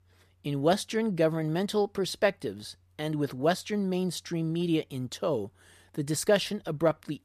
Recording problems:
none

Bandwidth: 14.5 kHz